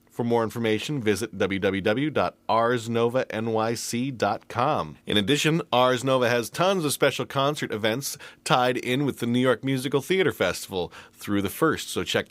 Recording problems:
none

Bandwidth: 15.5 kHz